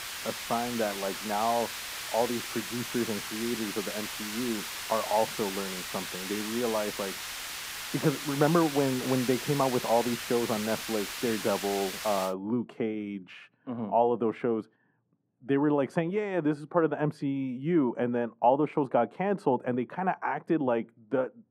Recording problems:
muffled; very; fading above 2.5 kHz
hiss; loud; until 12 s; 5 dB below the speech

